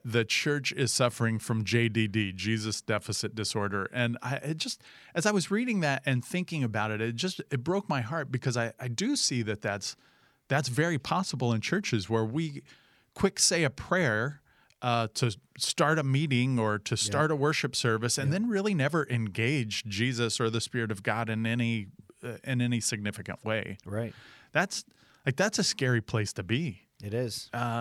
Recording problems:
abrupt cut into speech; at the end

